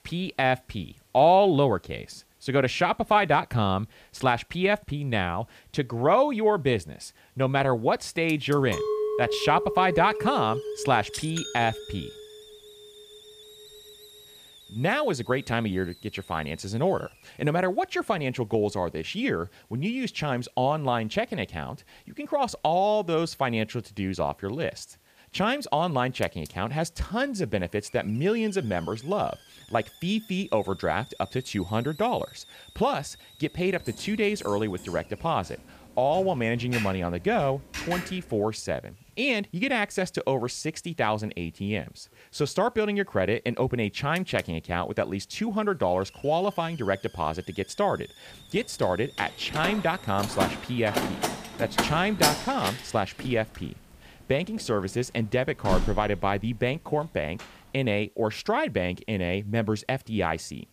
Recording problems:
hiss; faint; throughout; 25 dB below the speech
clattering dishes; noticeable; from 8.5 to 12 s; peak 1 dB below the speech
keyboard typing; noticeable; from 34 to 38 s; peak 6 dB below the speech
door banging; loud; from 49 to 56 s; peak 3 dB above the speech

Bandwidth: 15 kHz